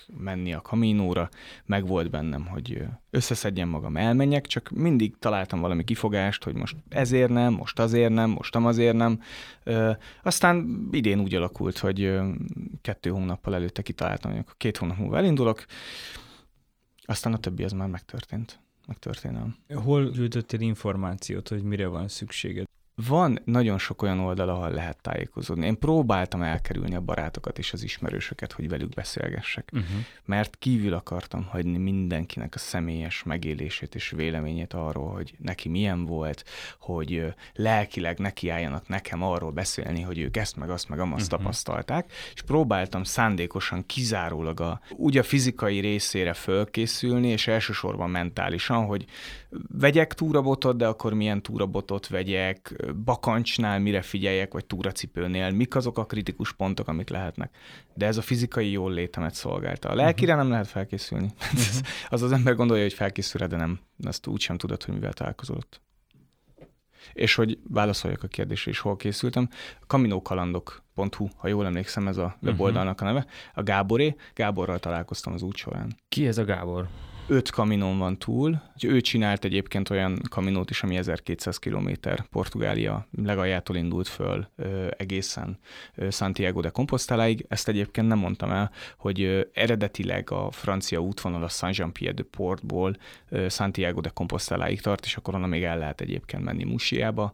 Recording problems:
none

